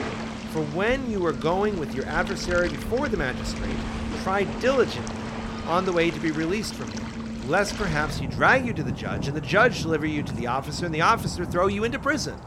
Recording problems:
rain or running water; loud; throughout; 8 dB below the speech

